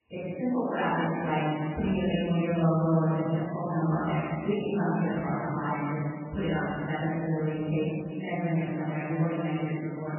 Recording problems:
room echo; strong; dies away in 2.4 s
off-mic speech; far
garbled, watery; badly; nothing above 3 kHz

